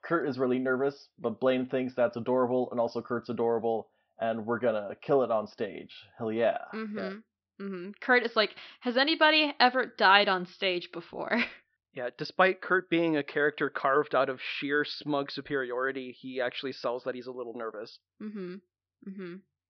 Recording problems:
high frequencies cut off; noticeable; nothing above 5.5 kHz

